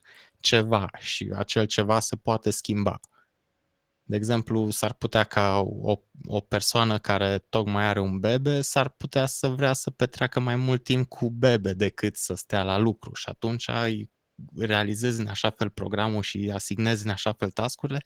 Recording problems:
garbled, watery; slightly

